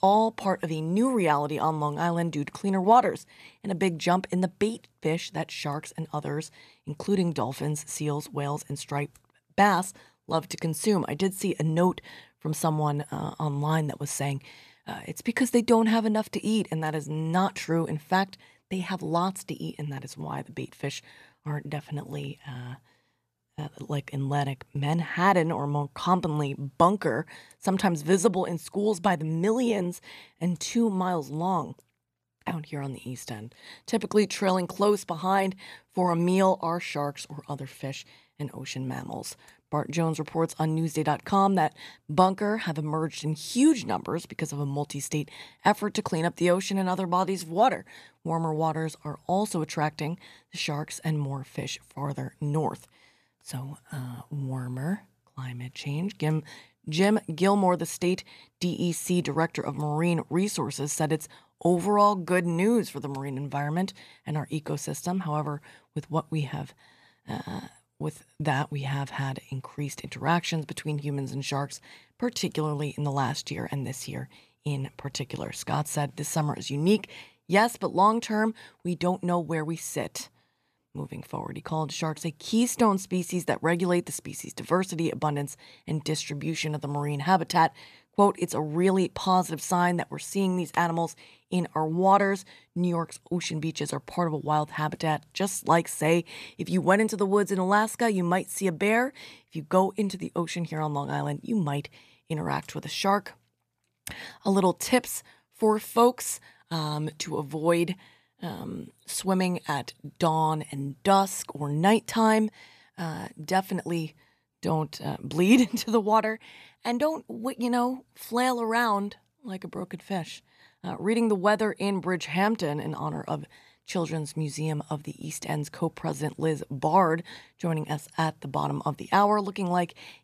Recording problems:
none

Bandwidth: 14.5 kHz